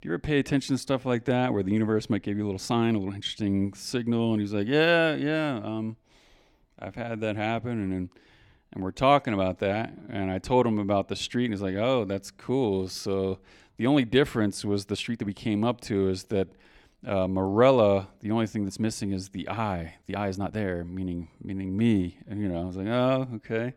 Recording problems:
uneven, jittery; strongly; from 1 to 23 s

